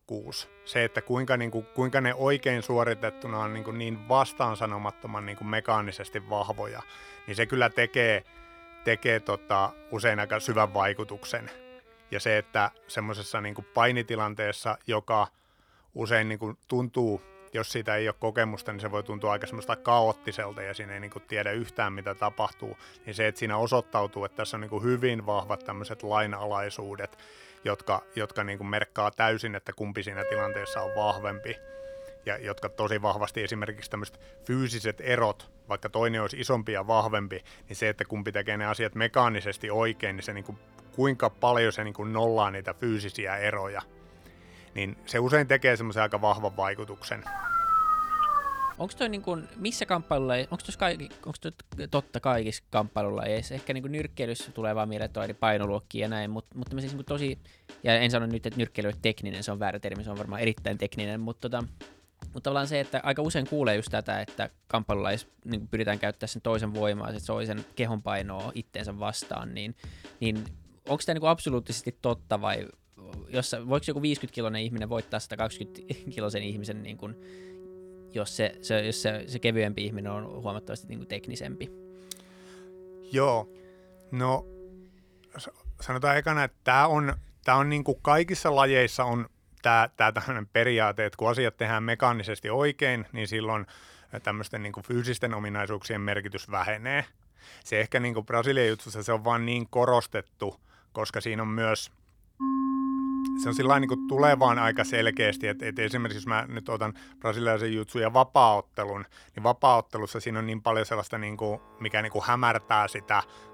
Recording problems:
background music; noticeable; throughout; 15 dB below the speech
dog barking; loud; from 47 to 49 s; peak 5 dB above the speech

